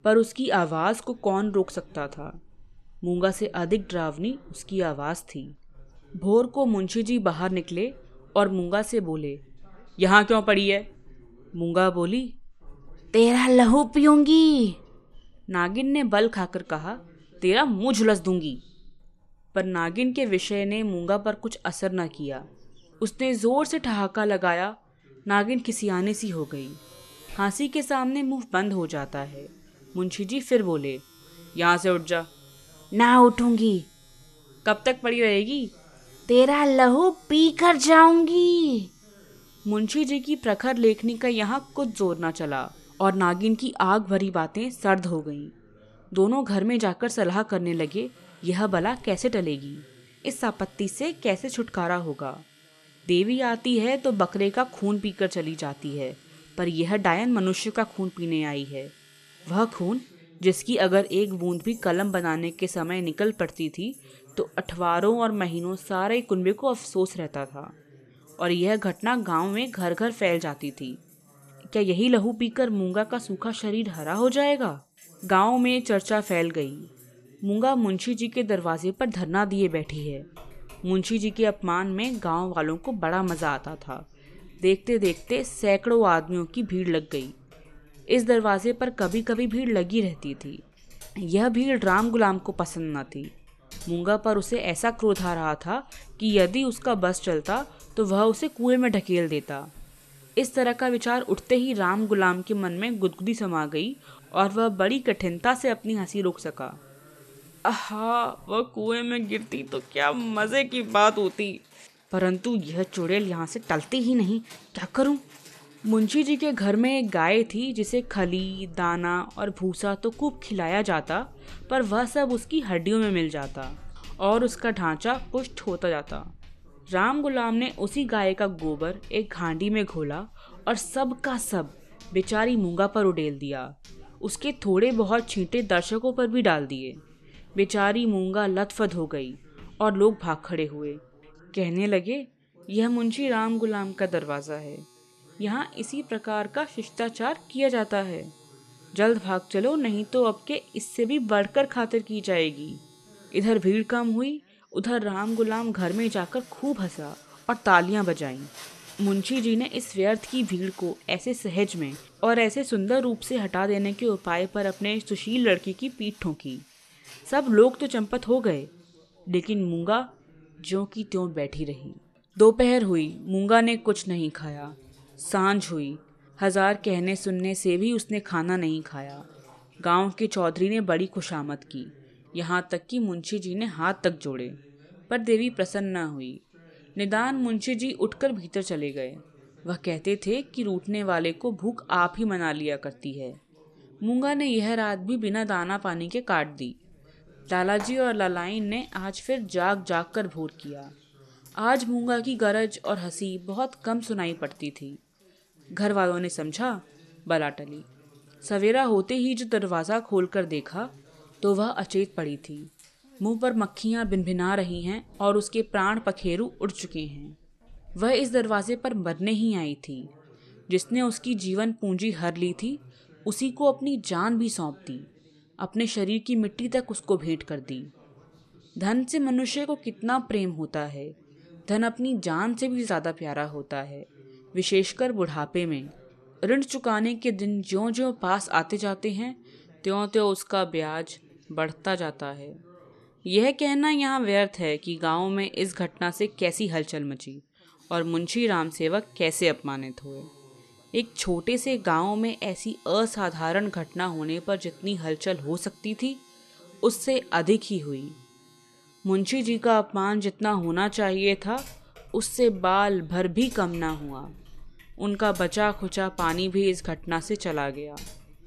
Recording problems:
household noises; faint; throughout; 25 dB below the speech
background chatter; faint; throughout; 2 voices, 30 dB below the speech

